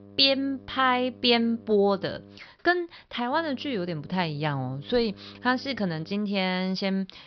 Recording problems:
high frequencies cut off; noticeable; nothing above 5.5 kHz
electrical hum; faint; until 2.5 s and from 3.5 to 6 s; 50 Hz, 25 dB below the speech

